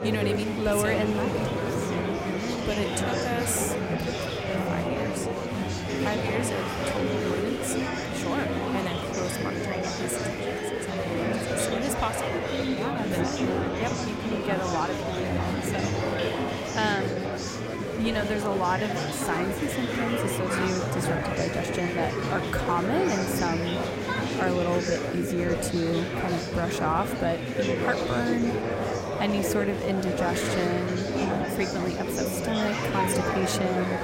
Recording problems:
murmuring crowd; very loud; throughout; 2 dB above the speech

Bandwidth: 16 kHz